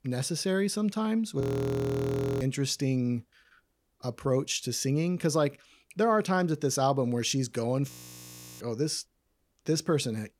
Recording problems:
audio freezing; at 1.5 s for 1 s and at 8 s for 0.5 s

